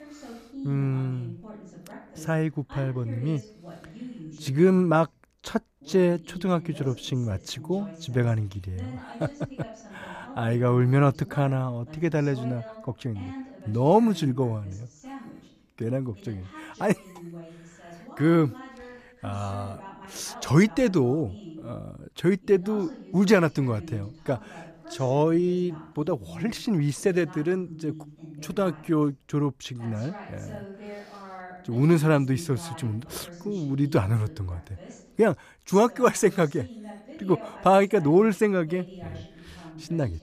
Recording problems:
voice in the background; noticeable; throughout; 20 dB below the speech

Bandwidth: 14.5 kHz